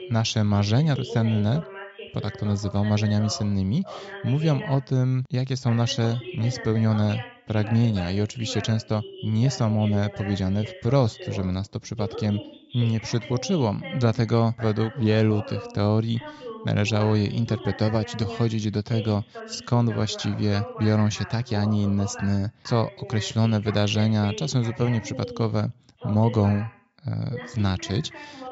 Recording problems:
high frequencies cut off; noticeable; nothing above 8 kHz
voice in the background; noticeable; throughout; 15 dB below the speech

